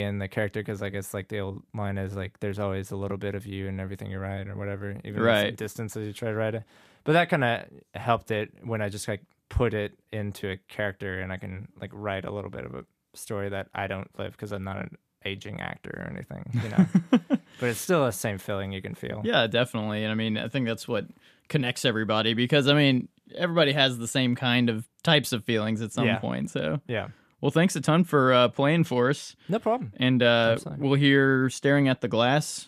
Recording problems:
abrupt cut into speech; at the start

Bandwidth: 14.5 kHz